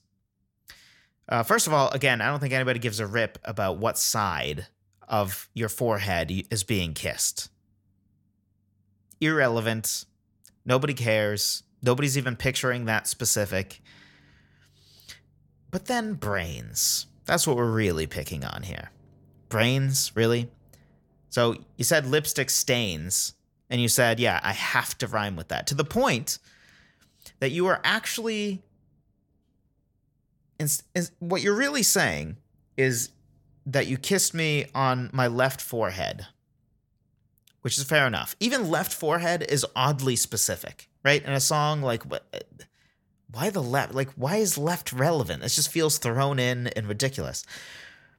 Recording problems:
none

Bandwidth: 17 kHz